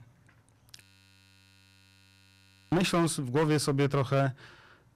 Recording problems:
distortion; heavy; 16% of the sound clipped
audio freezing; at 1 s for 2 s

